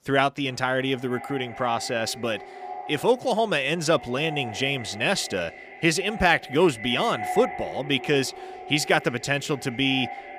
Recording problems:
echo of what is said; noticeable; throughout; 290 ms later, 15 dB below the speech

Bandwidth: 15 kHz